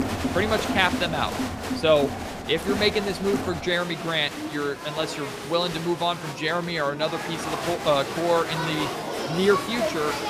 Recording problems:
crowd noise; loud; throughout; 5 dB below the speech

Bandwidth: 15 kHz